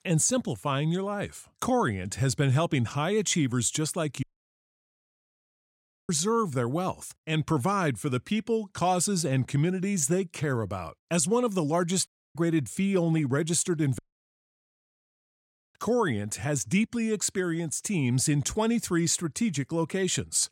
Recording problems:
audio cutting out; at 4 s for 2 s, at 12 s and at 14 s for 2 s

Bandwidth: 16 kHz